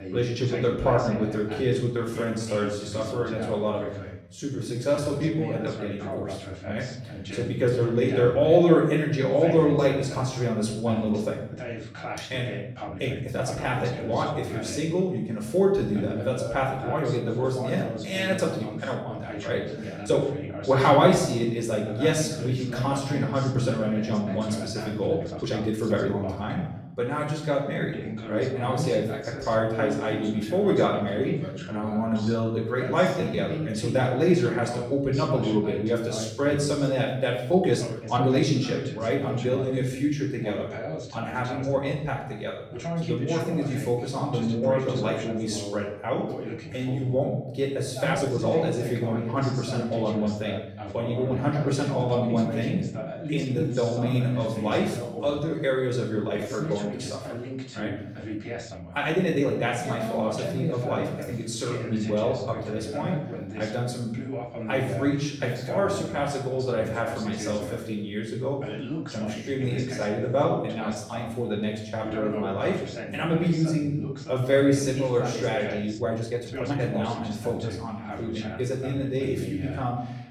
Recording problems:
off-mic speech; far
room echo; noticeable; dies away in 0.7 s
voice in the background; loud; throughout; 10 dB below the speech
uneven, jittery; strongly; from 2 s to 1:17

